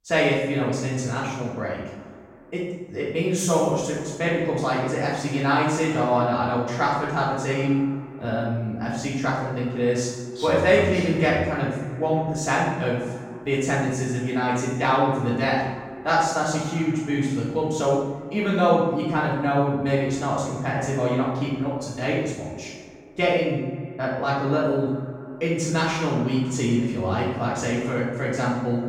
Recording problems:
room echo; strong; dies away in 0.9 s
off-mic speech; far
echo of what is said; noticeable; throughout; 120 ms later, 15 dB below the speech

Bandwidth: 16 kHz